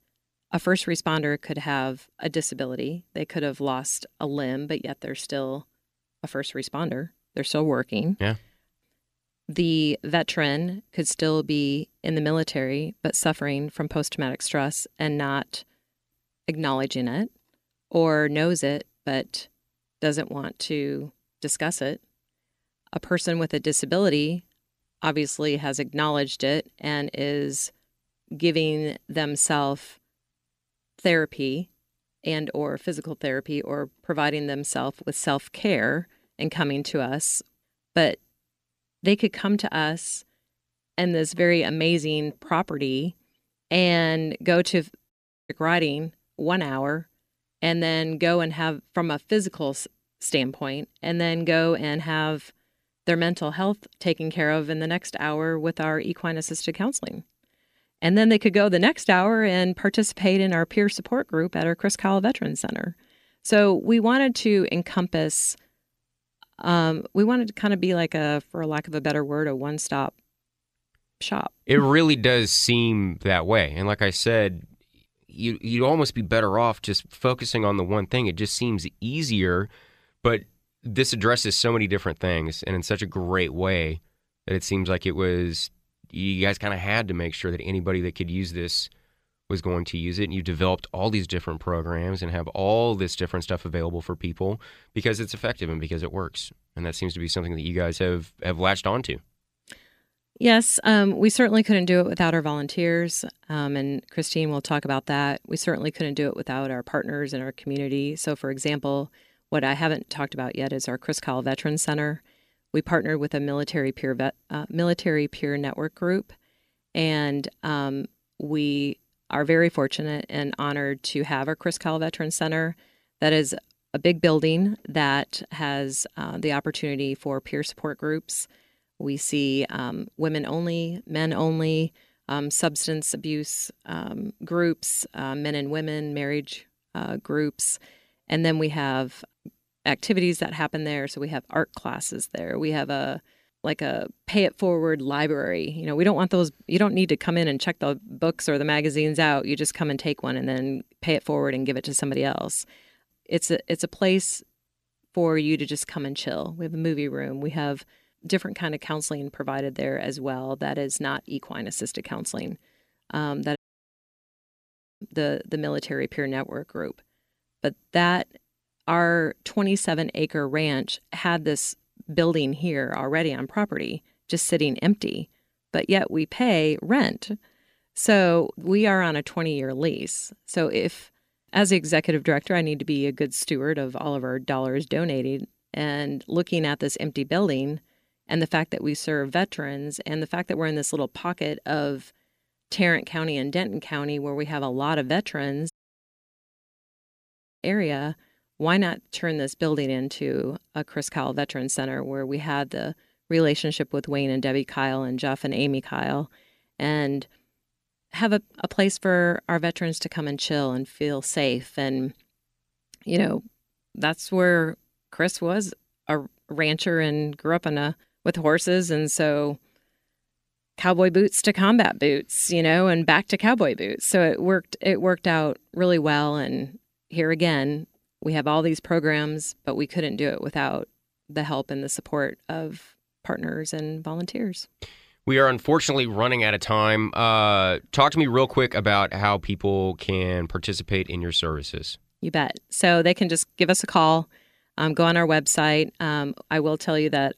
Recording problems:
audio cutting out; at 45 s, at 2:44 for 1.5 s and at 3:16 for 2 s

